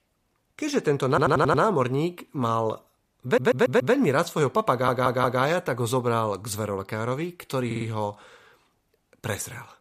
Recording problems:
audio stuttering; 4 times, first at 1 s

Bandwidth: 14.5 kHz